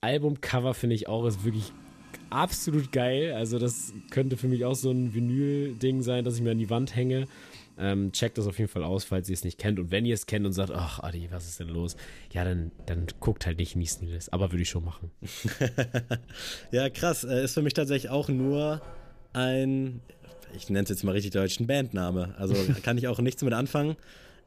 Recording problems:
household noises; faint; throughout; 25 dB below the speech

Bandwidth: 14.5 kHz